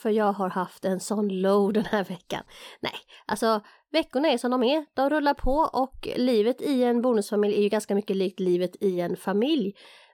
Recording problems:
none

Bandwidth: 18 kHz